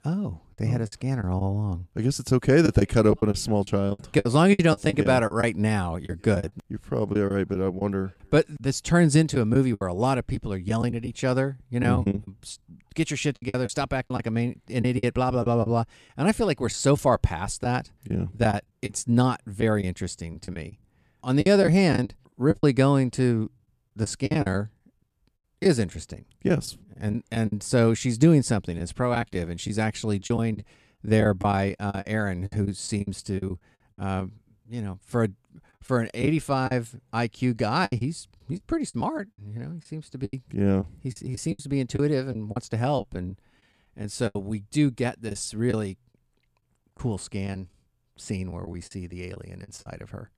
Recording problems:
choppy; very; 10% of the speech affected

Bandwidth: 14.5 kHz